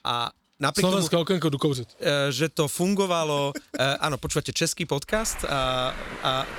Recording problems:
traffic noise; noticeable; throughout; 15 dB below the speech

